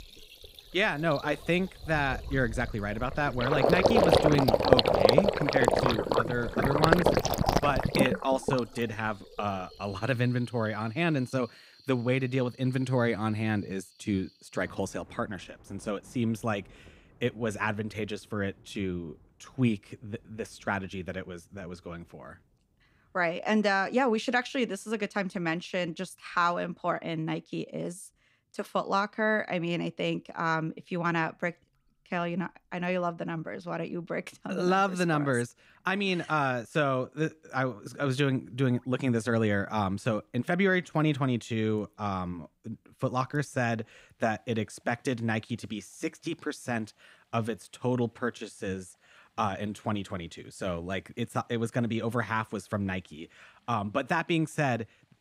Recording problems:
rain or running water; very loud; throughout; 4 dB above the speech

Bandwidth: 15.5 kHz